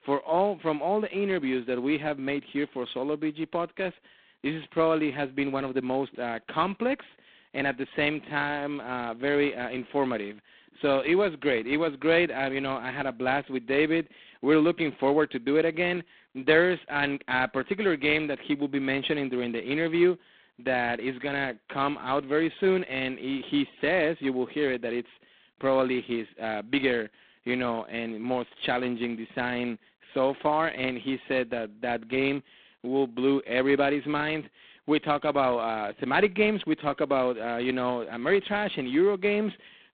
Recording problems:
phone-call audio; poor line; nothing above 4 kHz

